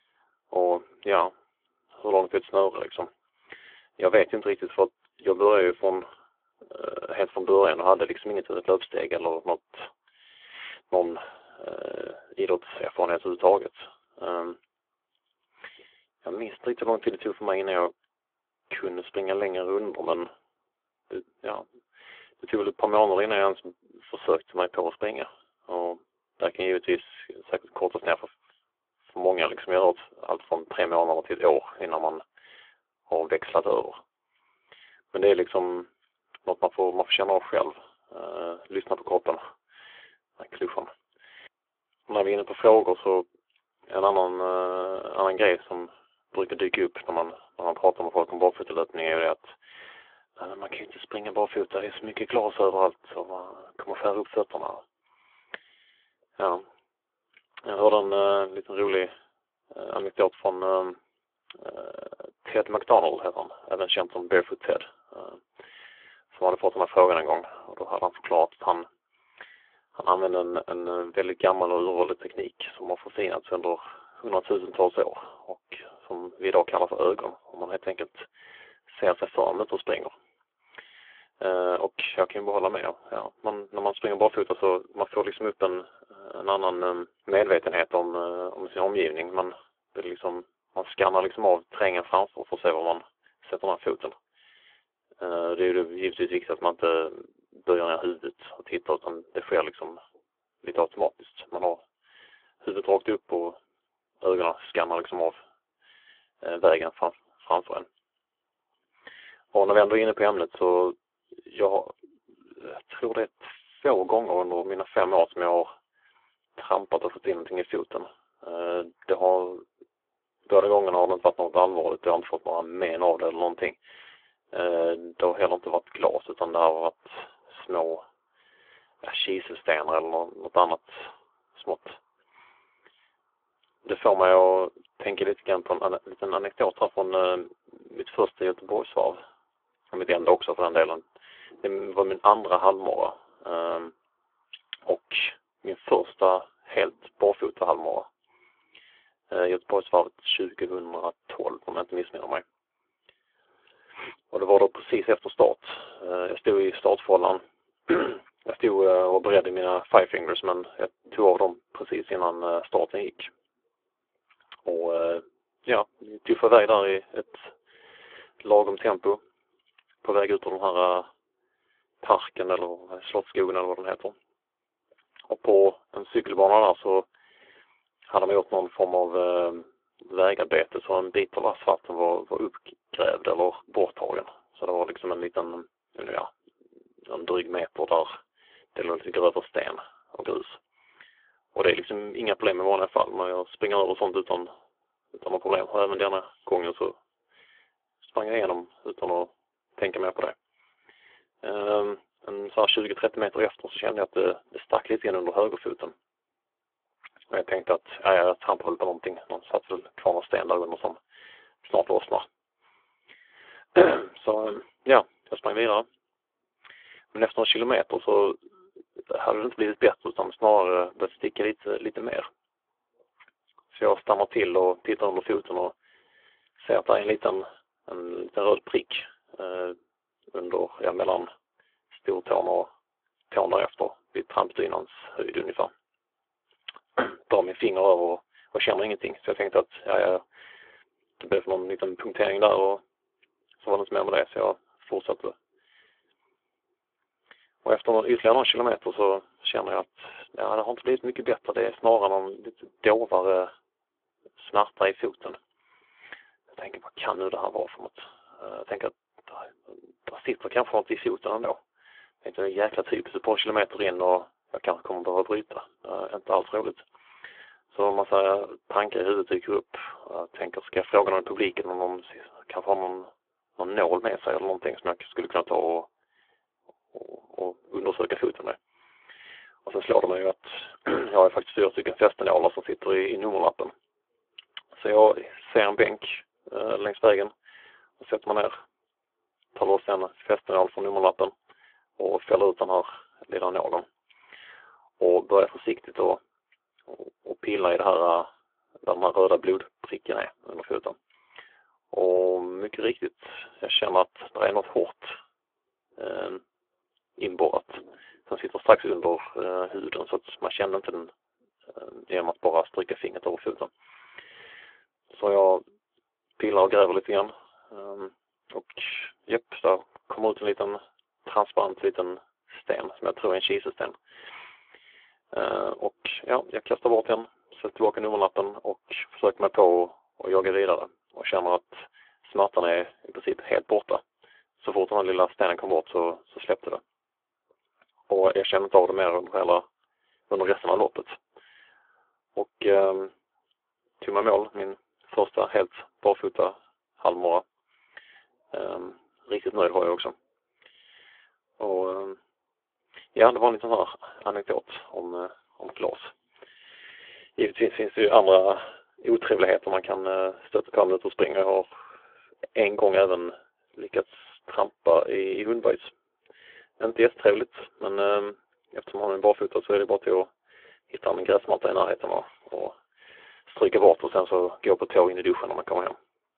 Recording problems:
phone-call audio; nothing above 3.5 kHz

